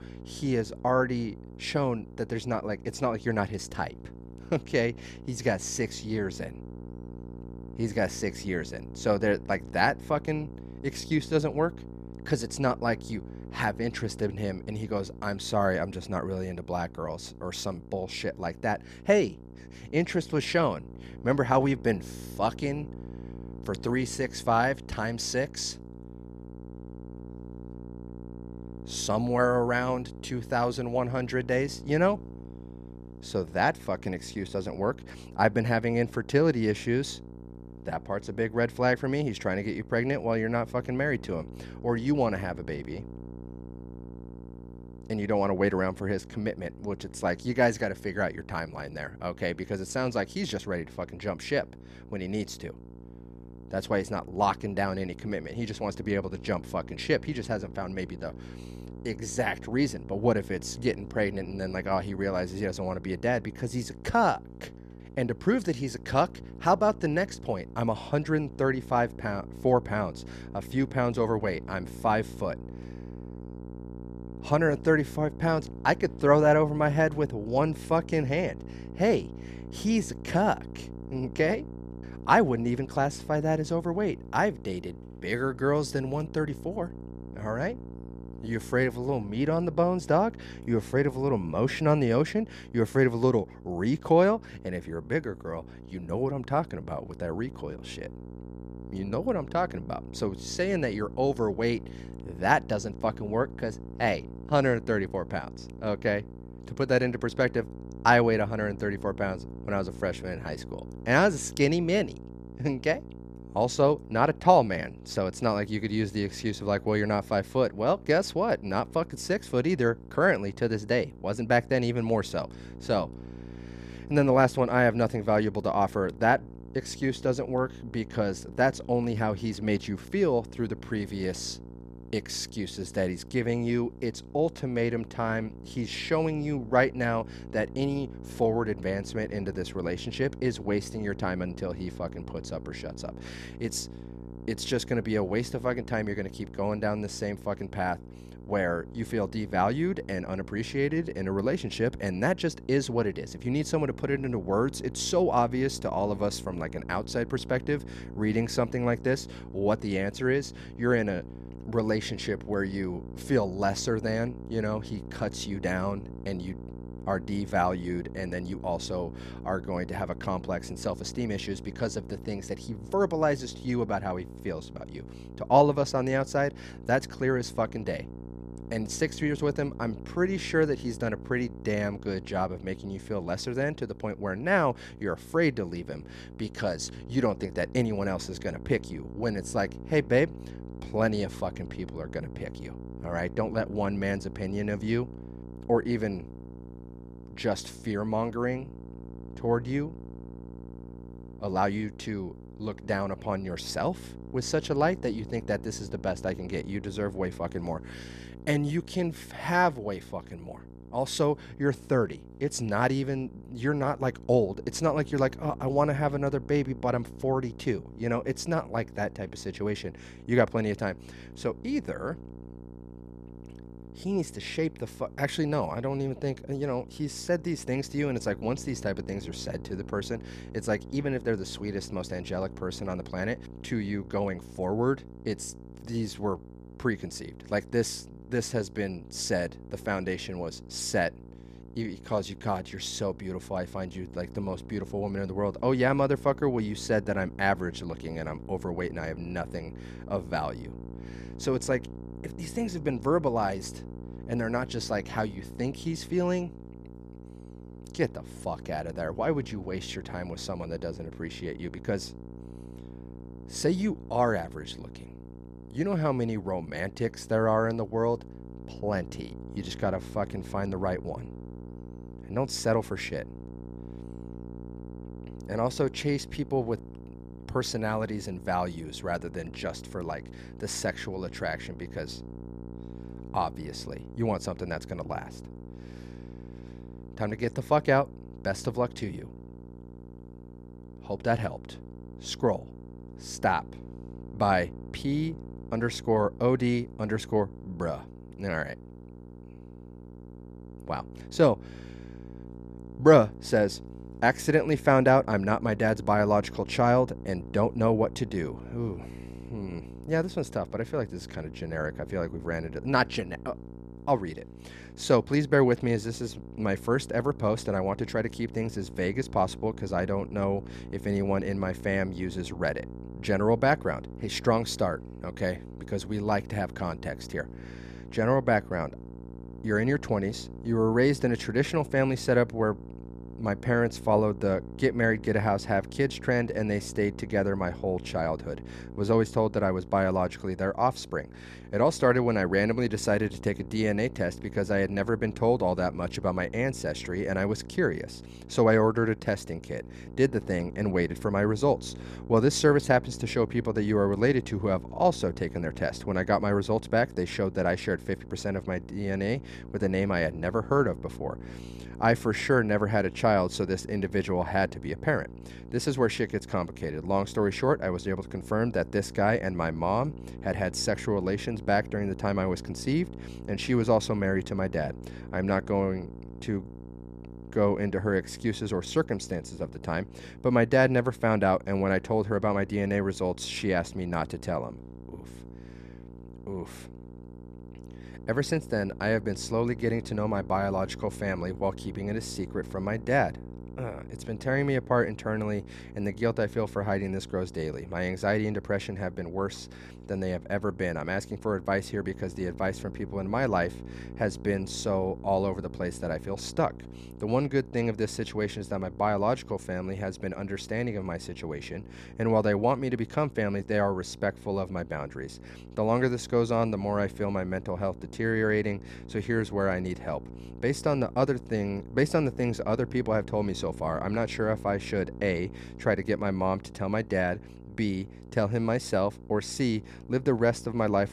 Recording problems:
electrical hum; faint; throughout; 60 Hz, 20 dB below the speech

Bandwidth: 14 kHz